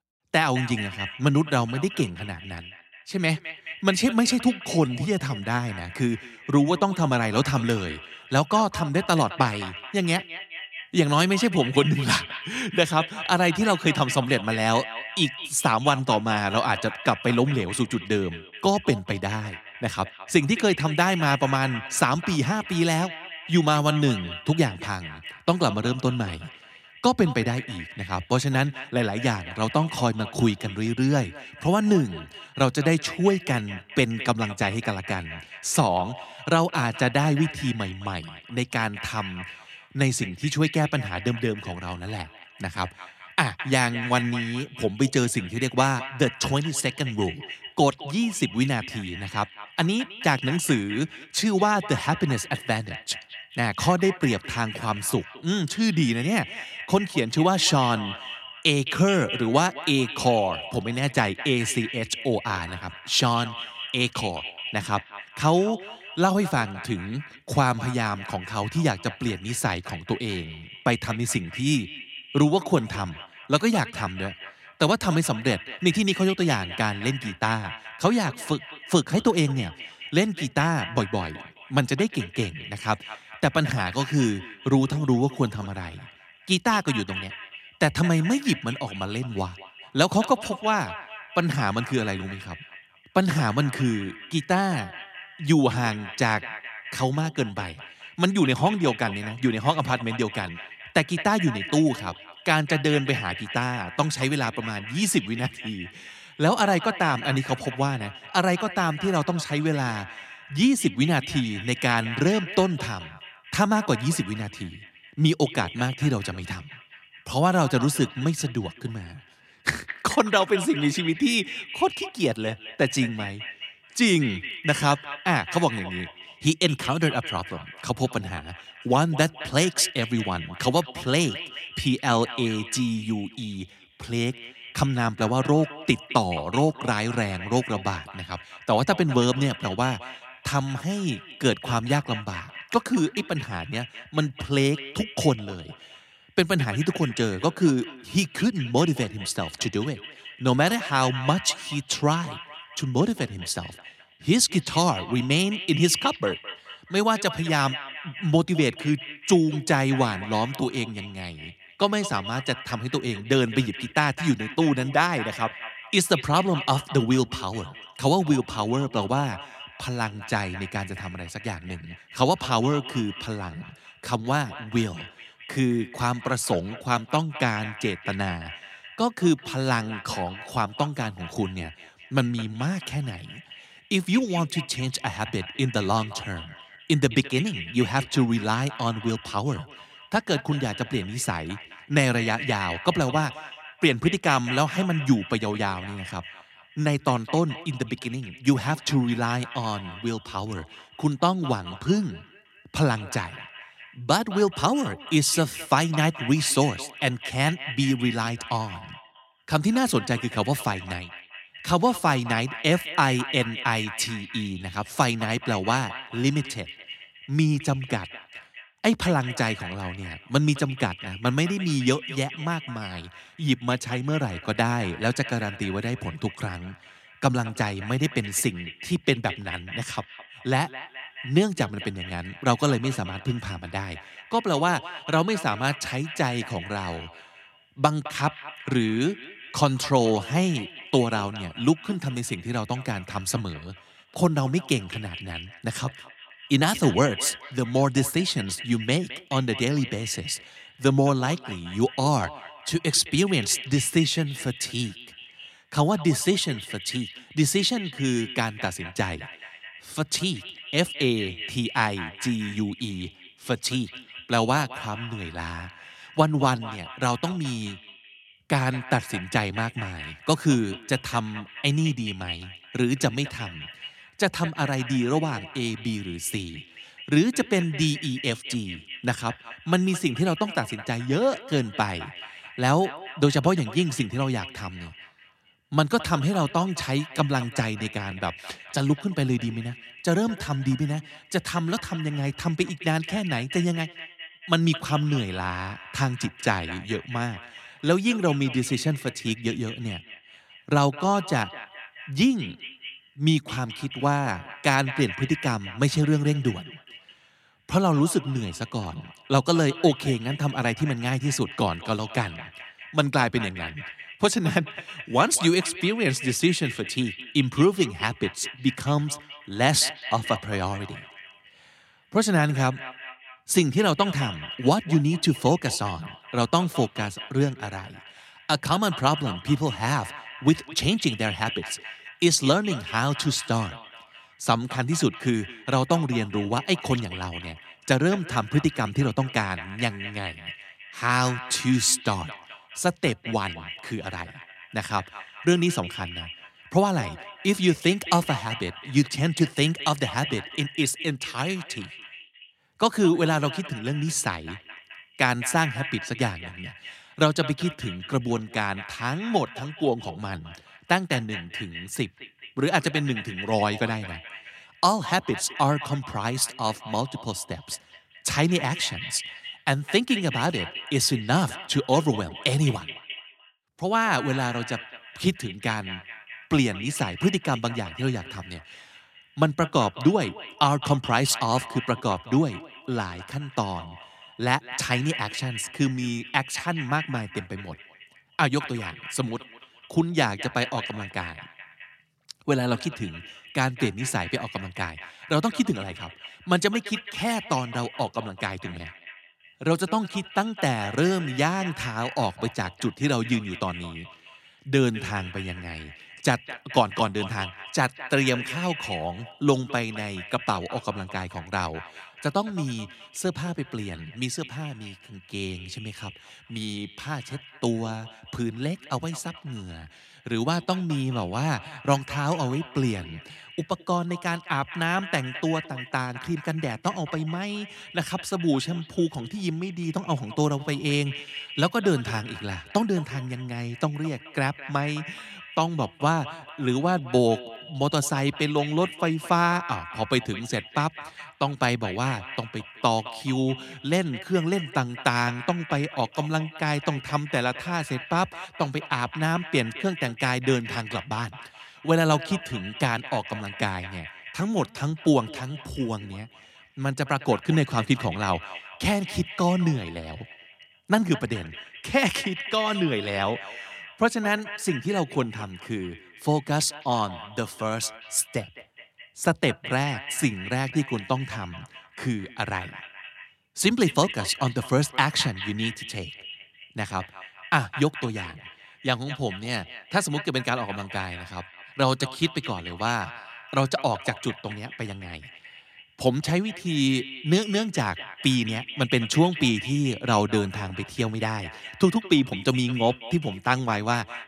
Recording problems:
echo of what is said; noticeable; throughout; 210 ms later, 15 dB below the speech

